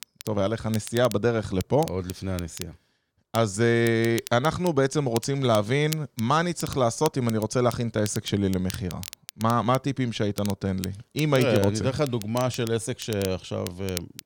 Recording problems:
crackle, like an old record; noticeable; 15 dB below the speech

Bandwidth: 17 kHz